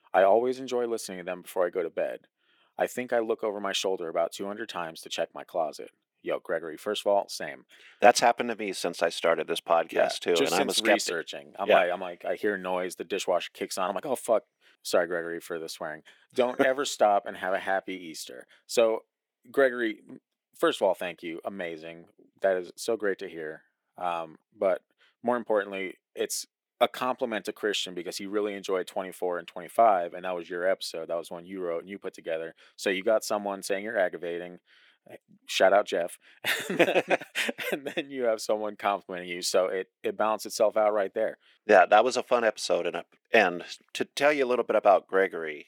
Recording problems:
thin; very; fading below 300 Hz

